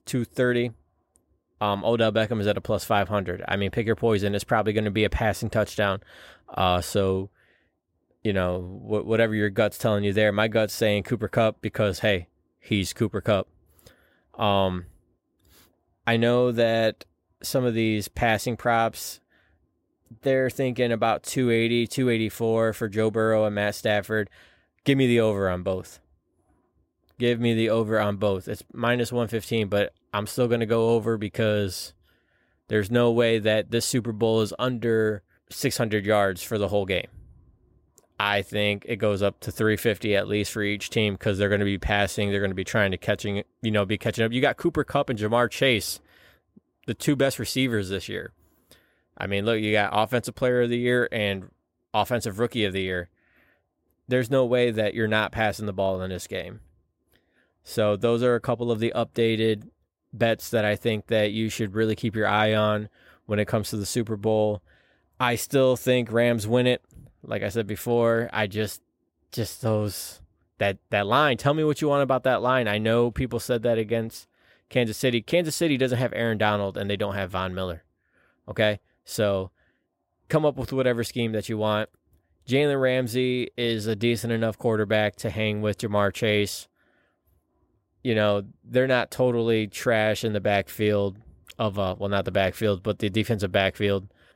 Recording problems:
none

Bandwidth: 16 kHz